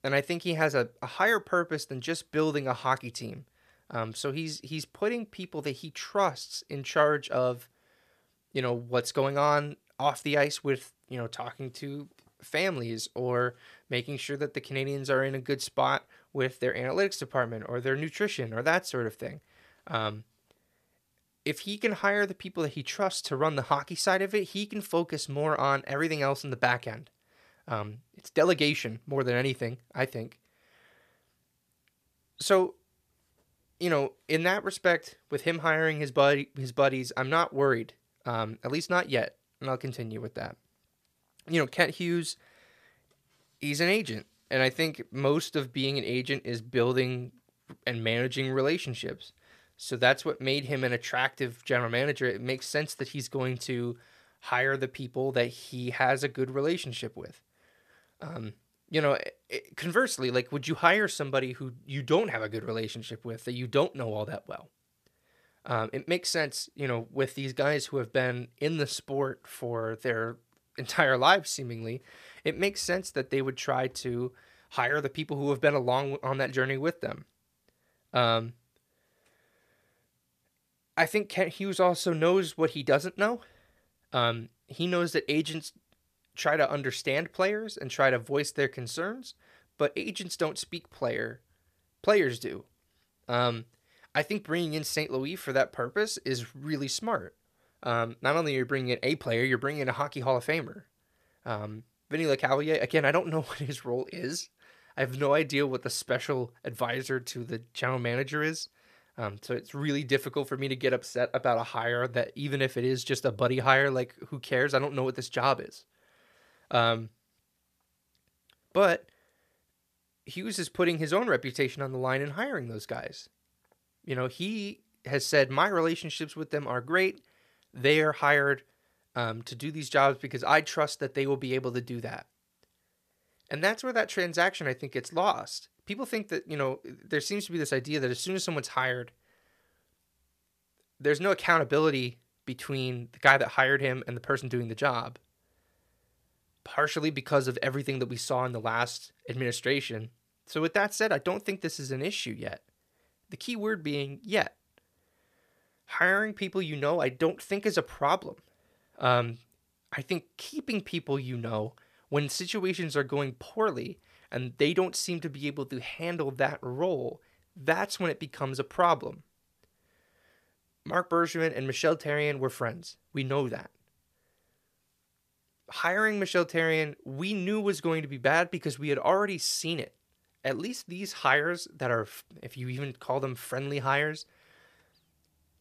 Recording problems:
none

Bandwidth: 14.5 kHz